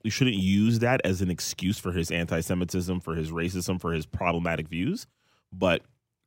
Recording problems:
none

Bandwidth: 16 kHz